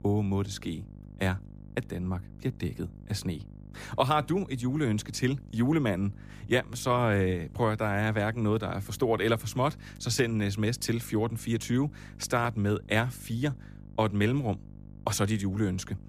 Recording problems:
electrical hum; faint; throughout; 50 Hz, 25 dB below the speech

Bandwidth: 15 kHz